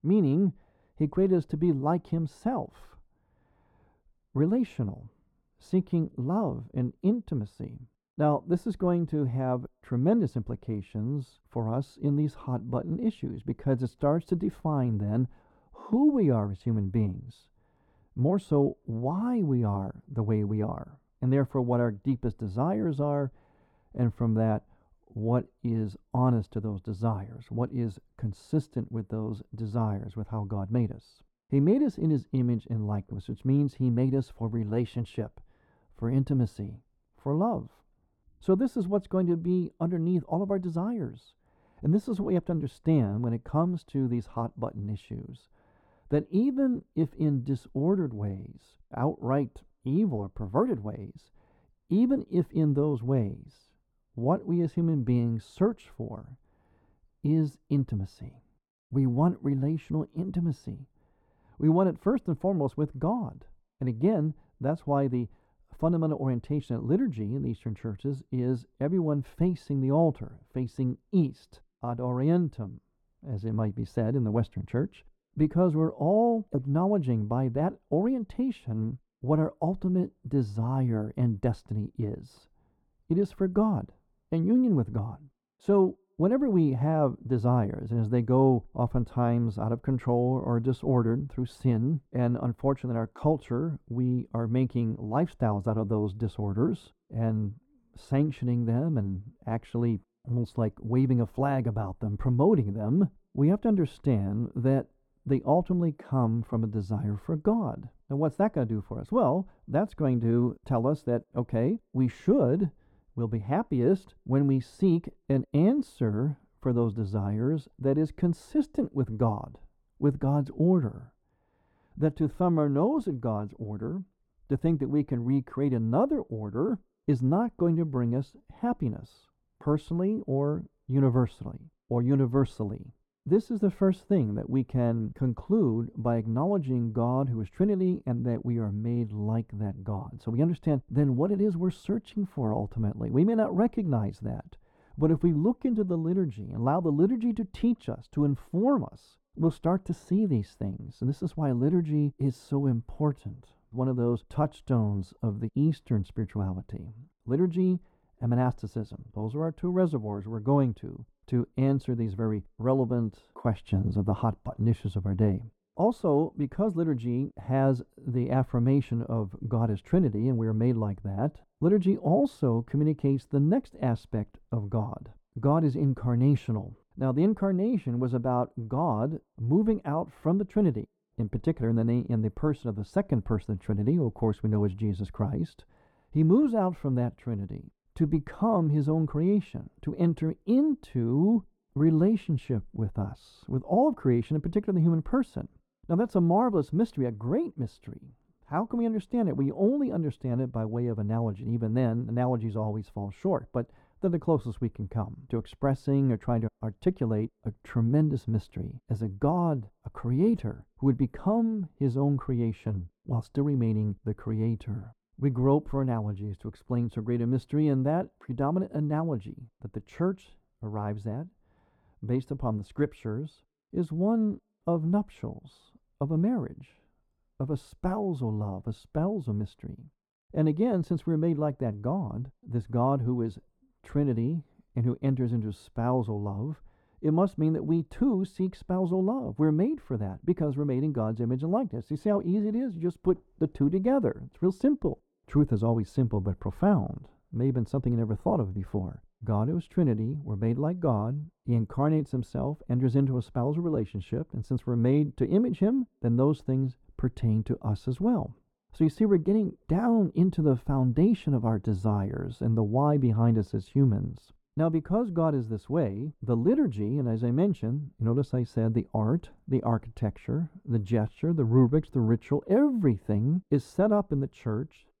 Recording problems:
muffled; very; fading above 2 kHz

